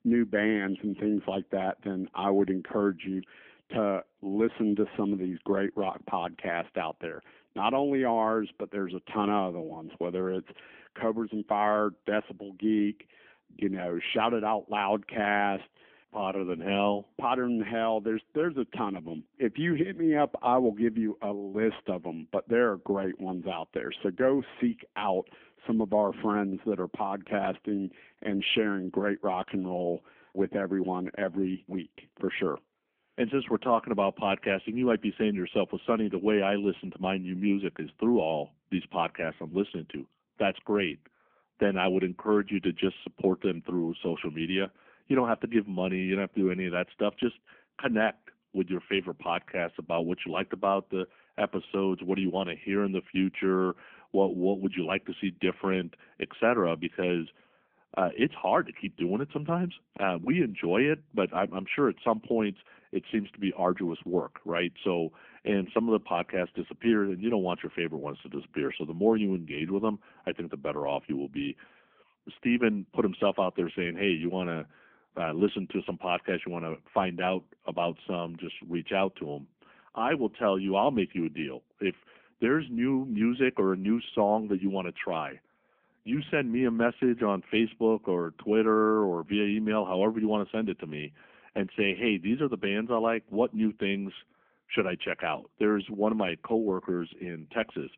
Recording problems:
phone-call audio; nothing above 3.5 kHz

